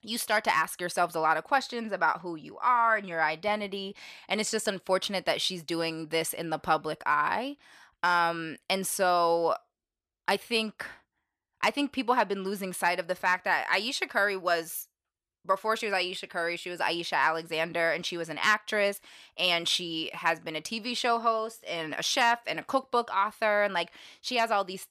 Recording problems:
none

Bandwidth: 14.5 kHz